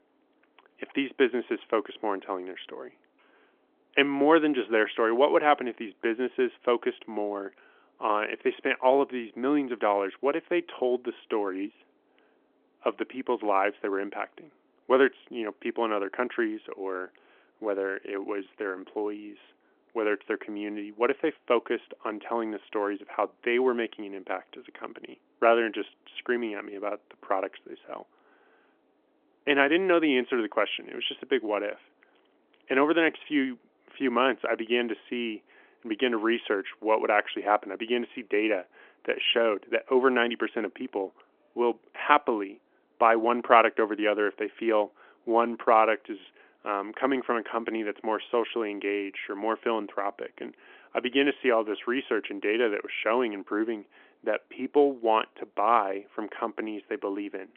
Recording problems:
phone-call audio; nothing above 3.5 kHz

